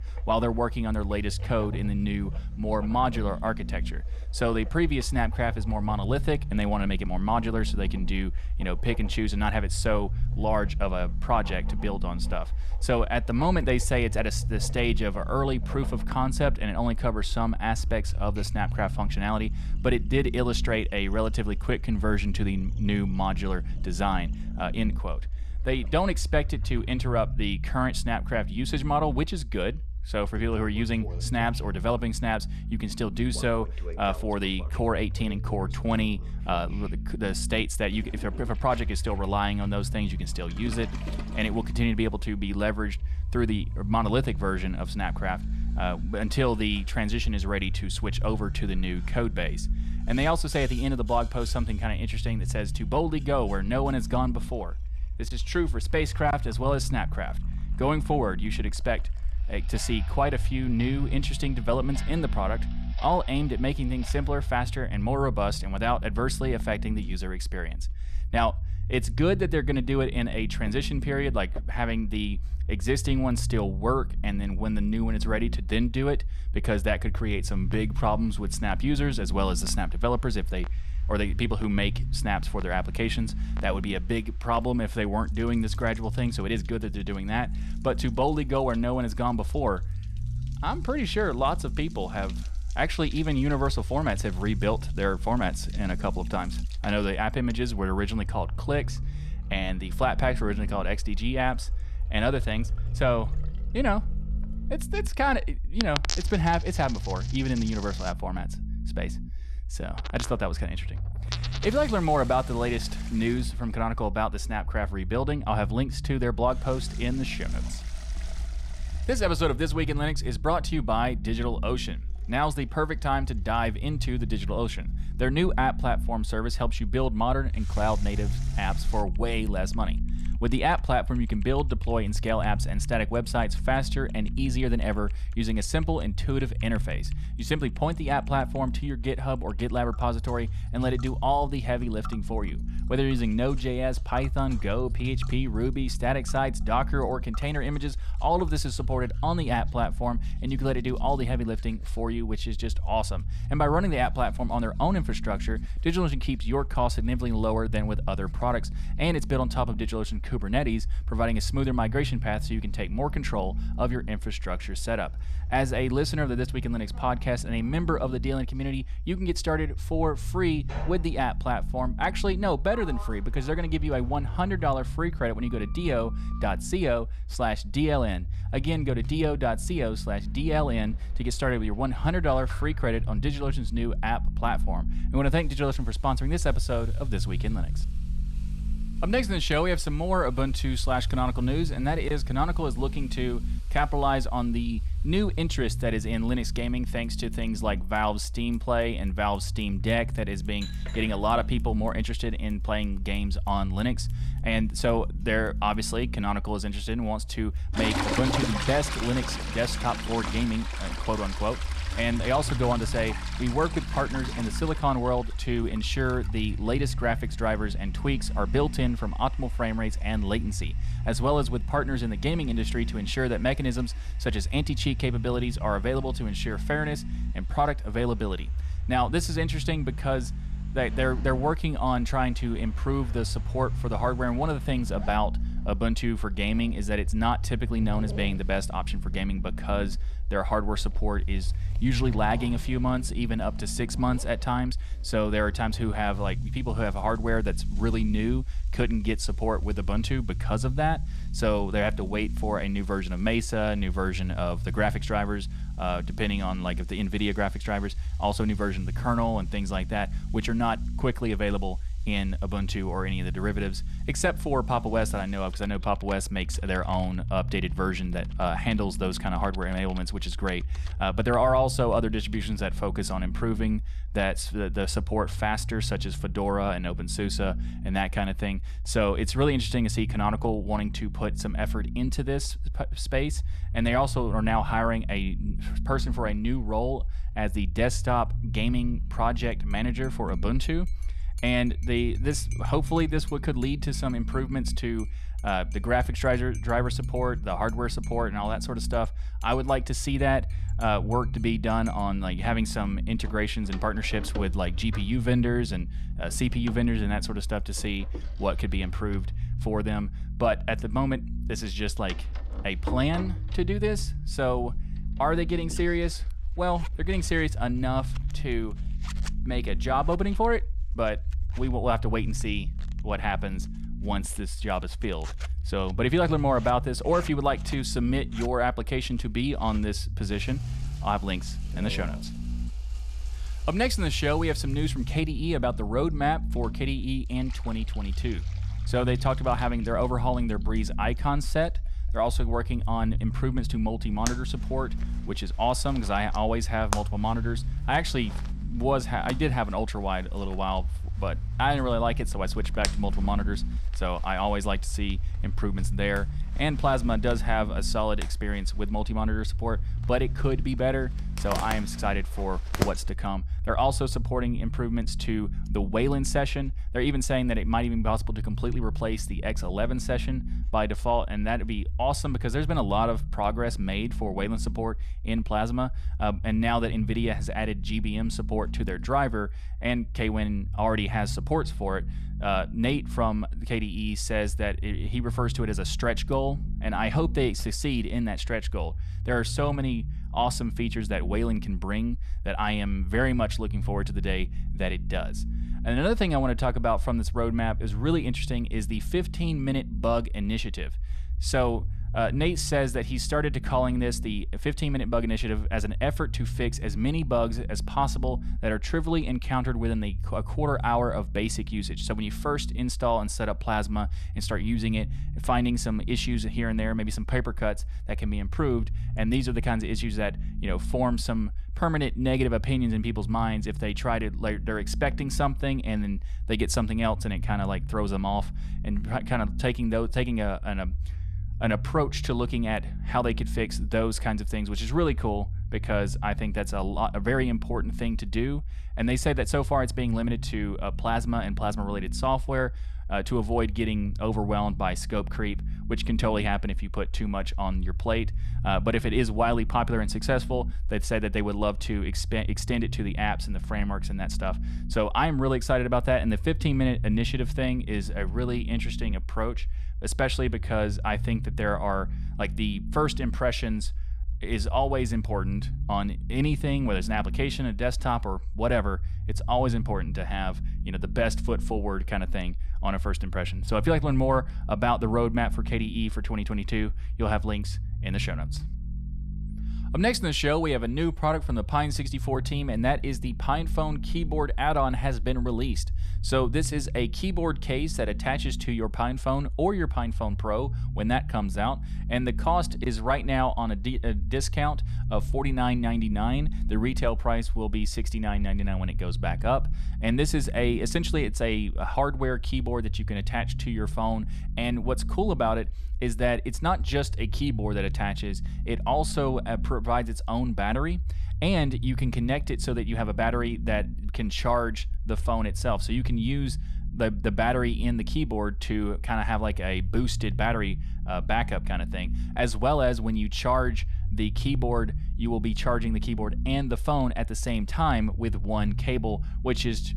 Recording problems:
household noises; noticeable; until 6:19; 15 dB below the speech
low rumble; faint; throughout; 20 dB below the speech

